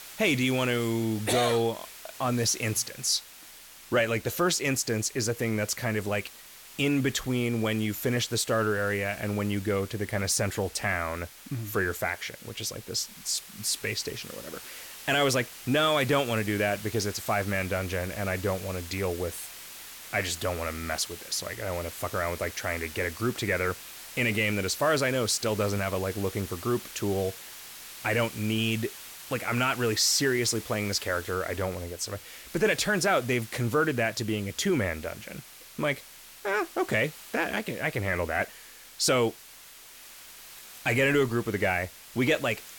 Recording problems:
hiss; noticeable; throughout; 15 dB below the speech

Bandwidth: 17 kHz